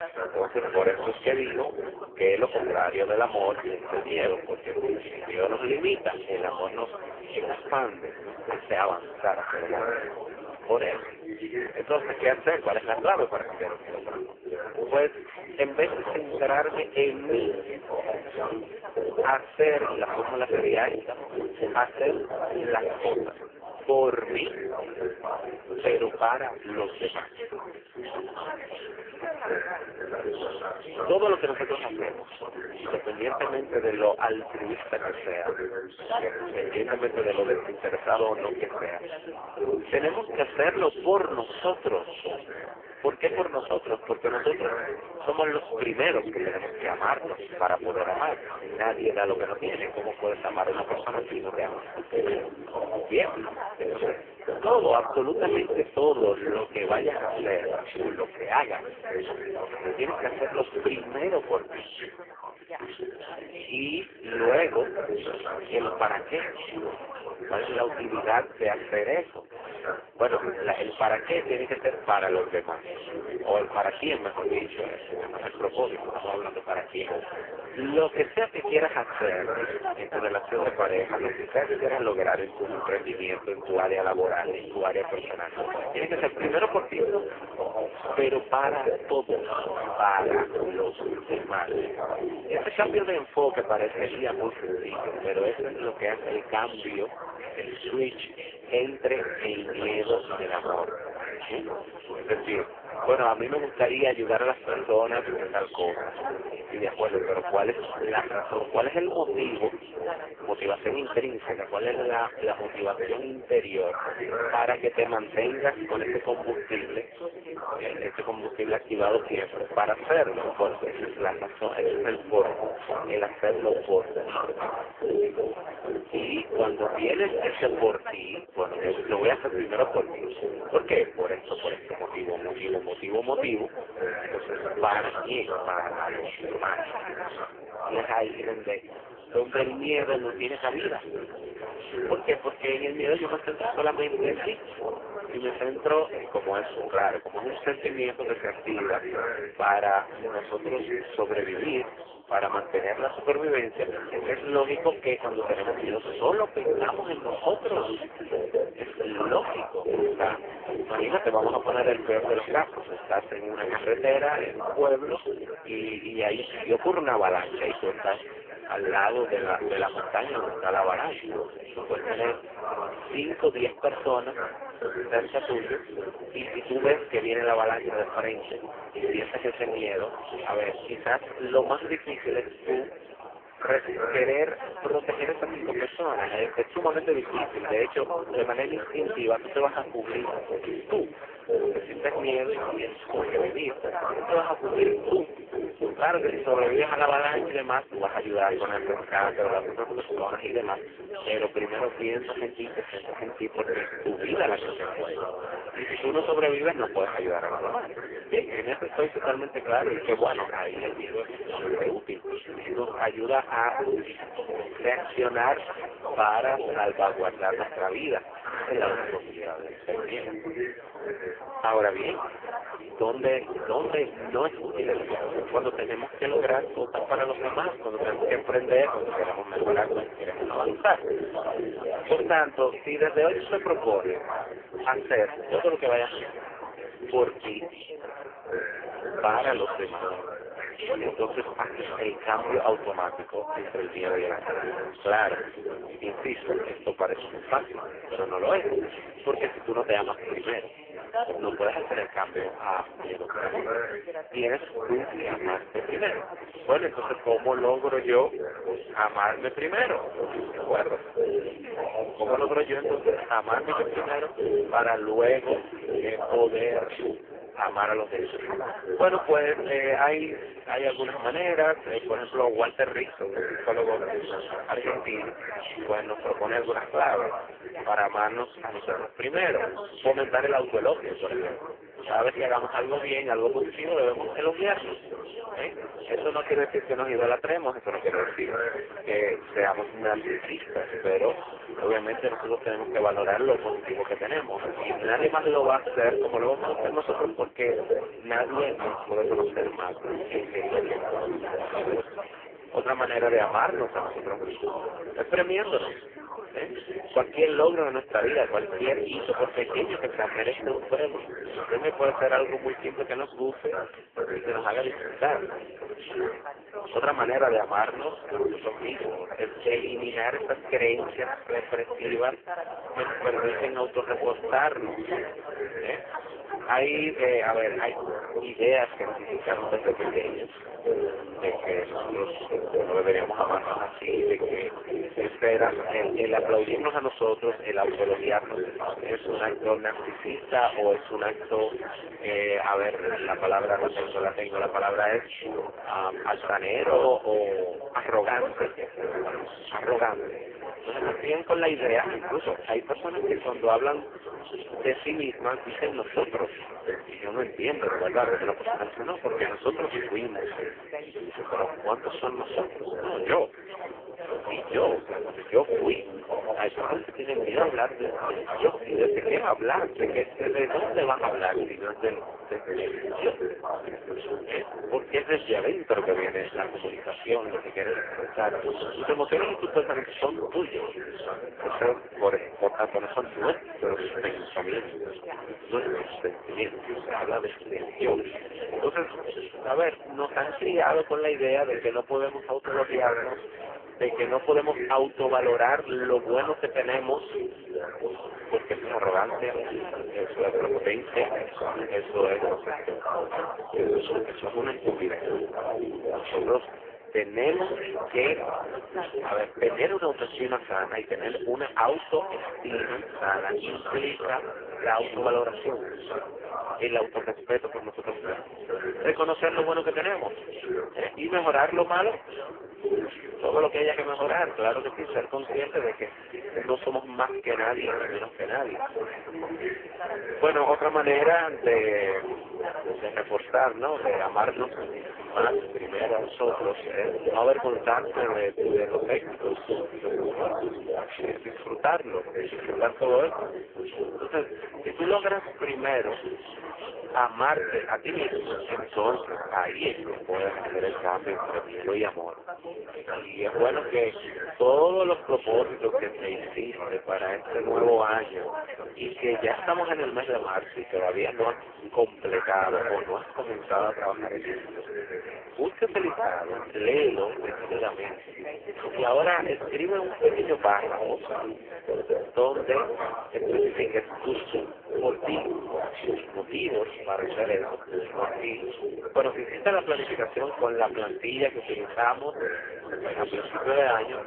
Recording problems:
phone-call audio; poor line
garbled, watery; badly
background chatter; loud; throughout; 3 voices, 6 dB below the speech

